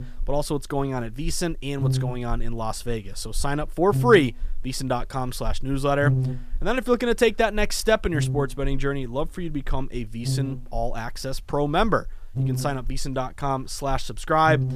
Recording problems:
electrical hum; noticeable; throughout; 50 Hz, 15 dB below the speech

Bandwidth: 14.5 kHz